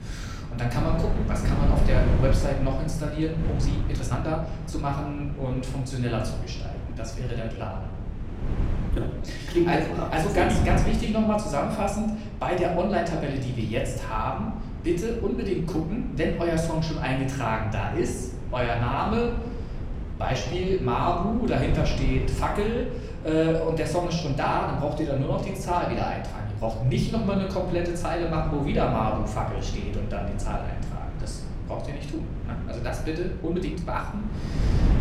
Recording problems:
off-mic speech; far
room echo; noticeable; dies away in 0.8 s
wind noise on the microphone; occasional gusts; 15 dB below the speech
uneven, jittery; strongly; from 3.5 to 34 s

